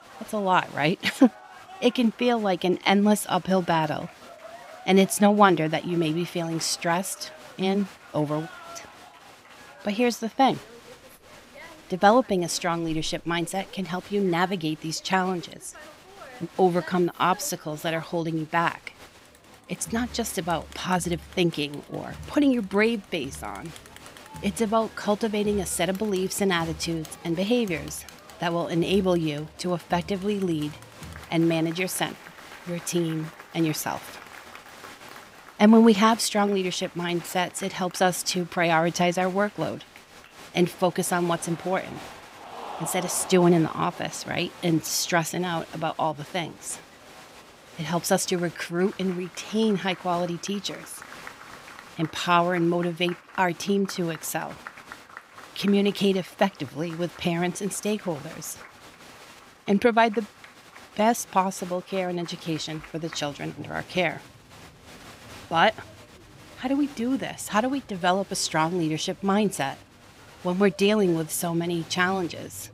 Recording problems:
crowd noise; noticeable; throughout; 20 dB below the speech

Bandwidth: 15.5 kHz